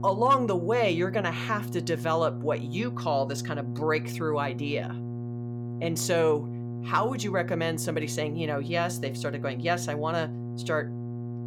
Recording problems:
electrical hum; noticeable; throughout; 60 Hz, 15 dB below the speech

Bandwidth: 17 kHz